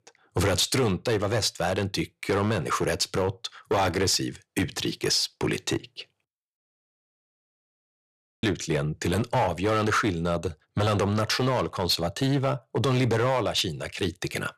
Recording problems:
distortion; slight; 8% of the sound clipped
audio cutting out; at 6.5 s for 2 s

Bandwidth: 14 kHz